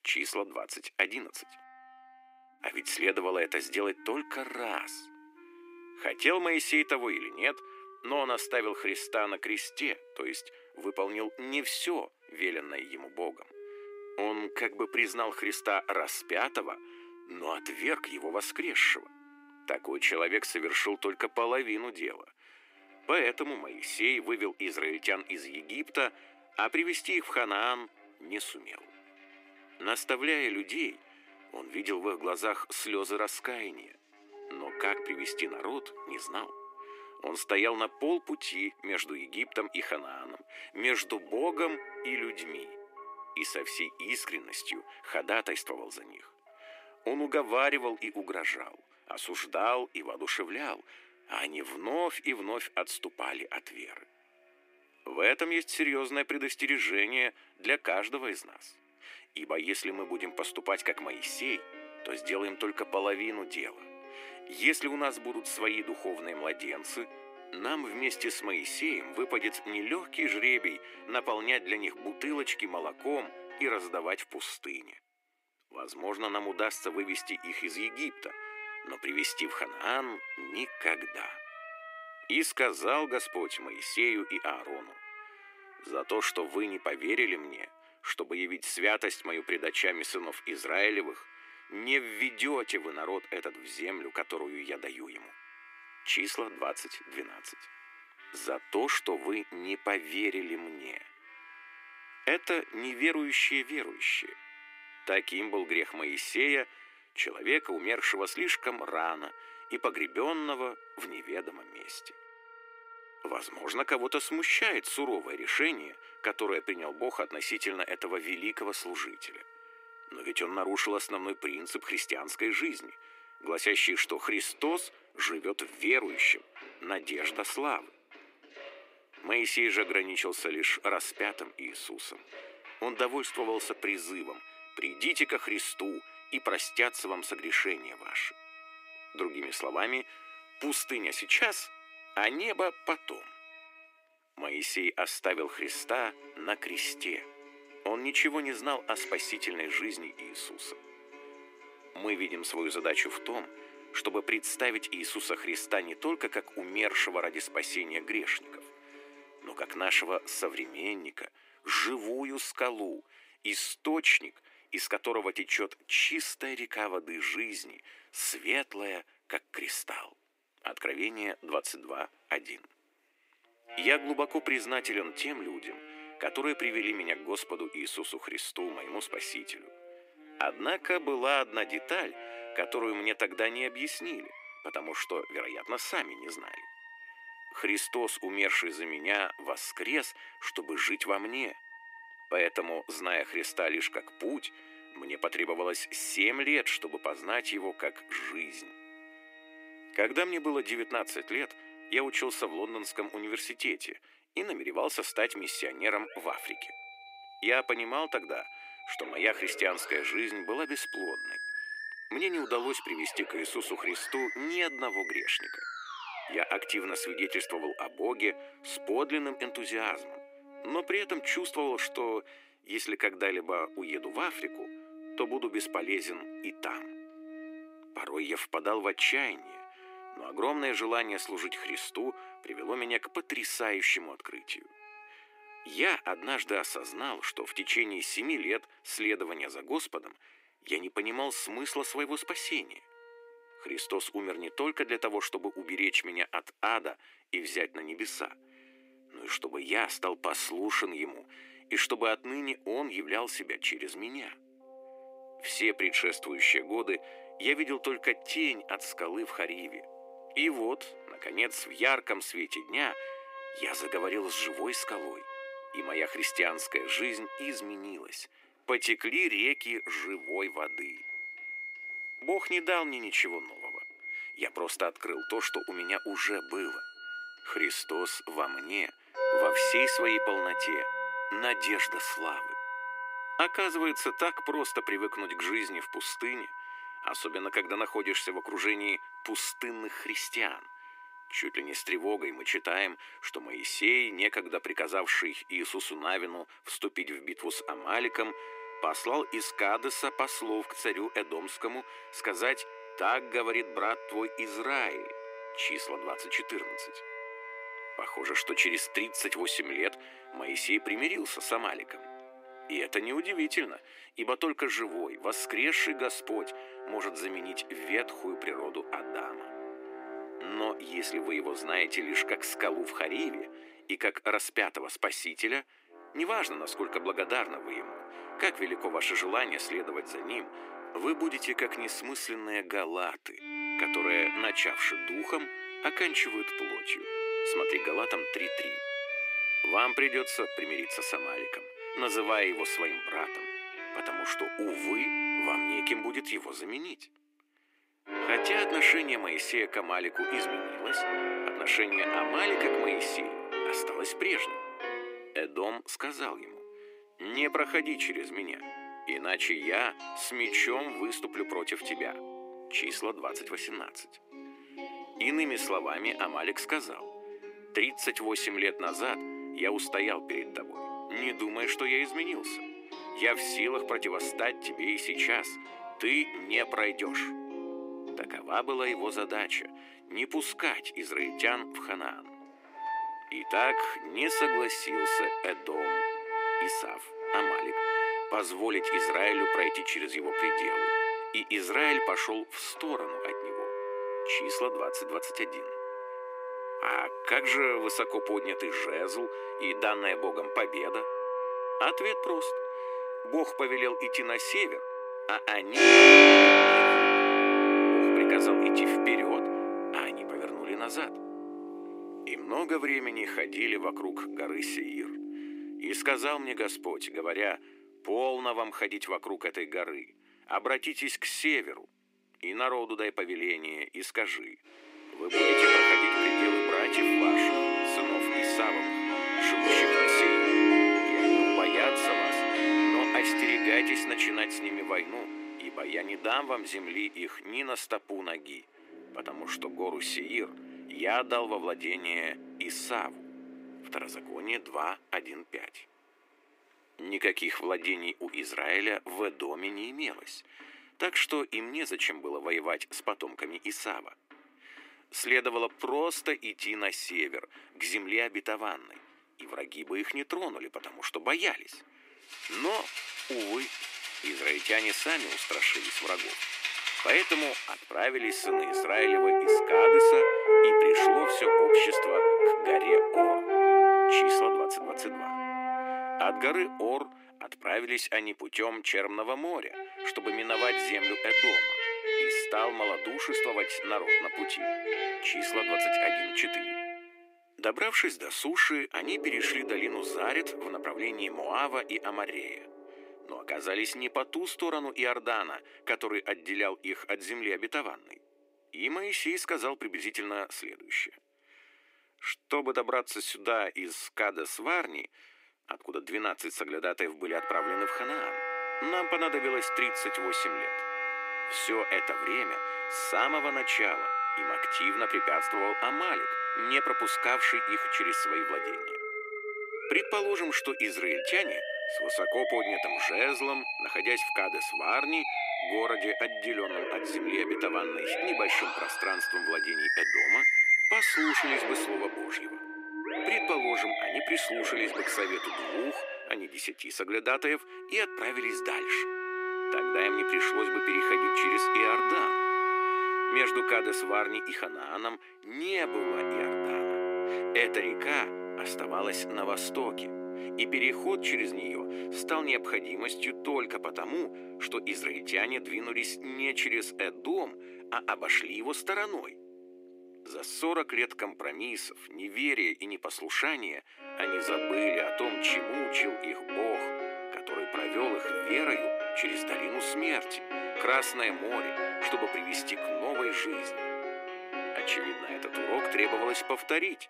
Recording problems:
thin; very; fading below 300 Hz
background music; very loud; throughout; 2 dB above the speech

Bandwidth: 15.5 kHz